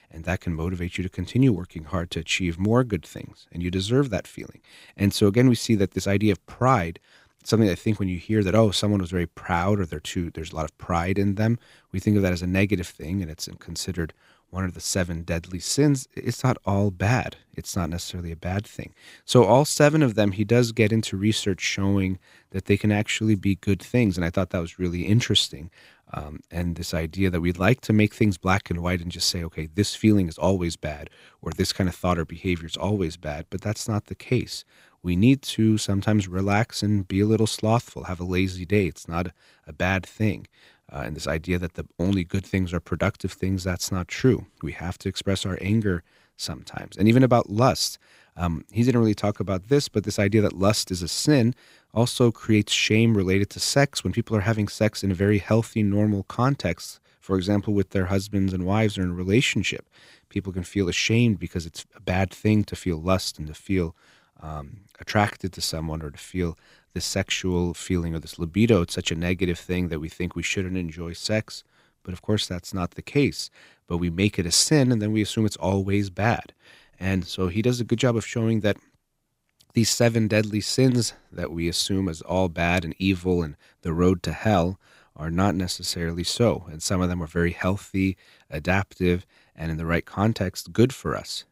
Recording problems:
none

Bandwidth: 15.5 kHz